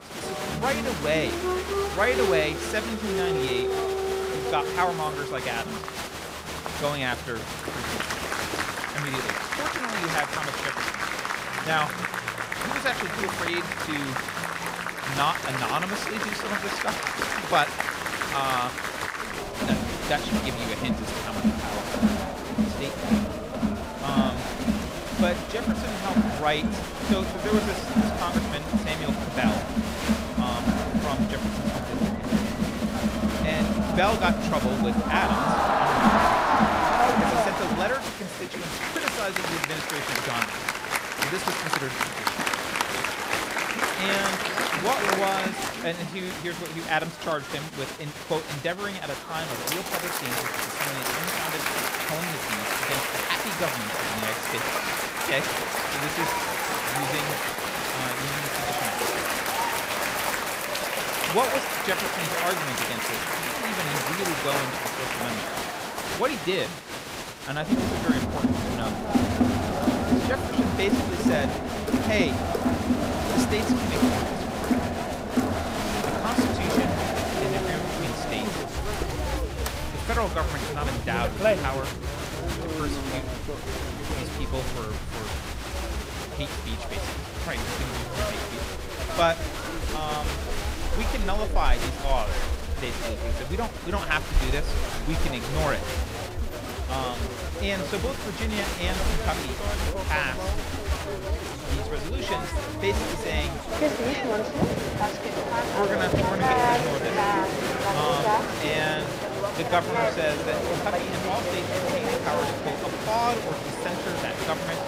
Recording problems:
crowd noise; very loud; throughout; 4 dB above the speech

